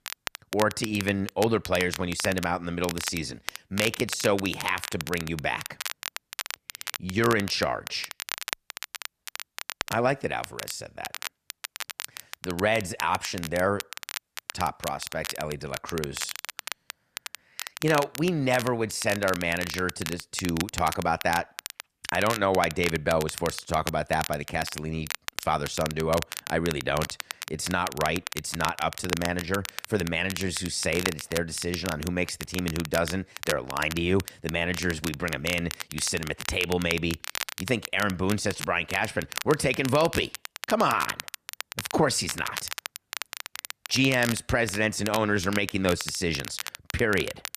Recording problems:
crackle, like an old record; loud; 8 dB below the speech

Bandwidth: 14.5 kHz